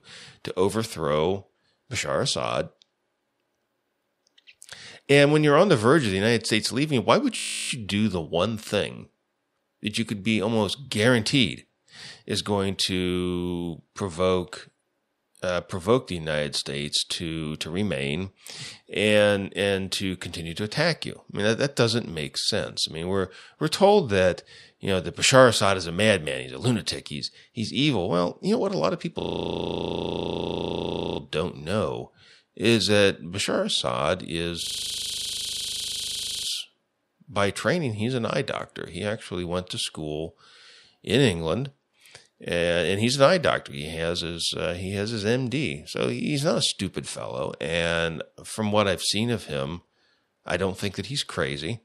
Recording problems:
audio freezing; at 7.5 s, at 29 s for 2 s and at 35 s for 2 s

